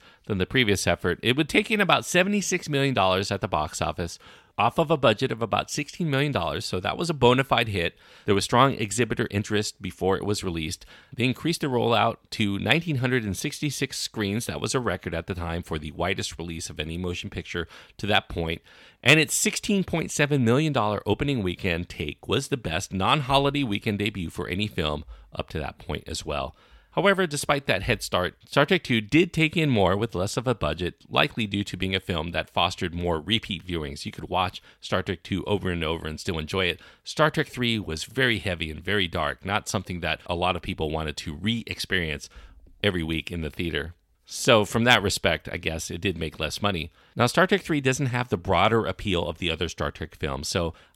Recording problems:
none

